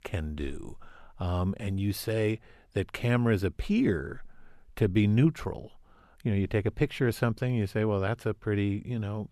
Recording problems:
none

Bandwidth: 14 kHz